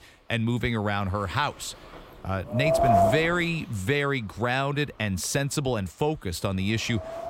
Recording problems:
wind noise on the microphone; heavy; 5 dB above the speech

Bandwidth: 16 kHz